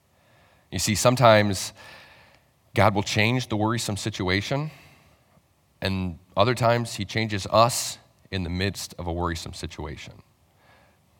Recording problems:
none

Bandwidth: 17 kHz